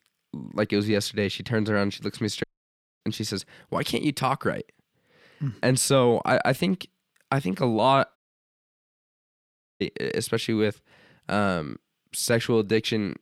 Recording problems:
audio cutting out; at 2.5 s for 0.5 s and at 8 s for 1.5 s

